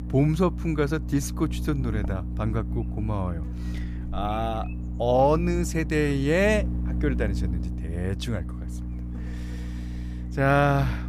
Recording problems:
electrical hum; noticeable; throughout; 60 Hz, 15 dB below the speech

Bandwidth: 14.5 kHz